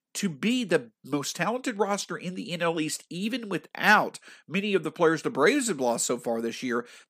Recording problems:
none

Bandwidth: 15 kHz